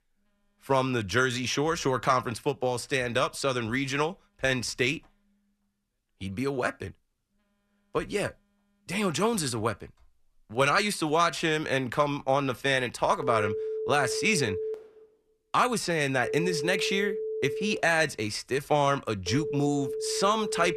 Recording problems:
alarms or sirens; loud; throughout; 6 dB below the speech

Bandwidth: 13.5 kHz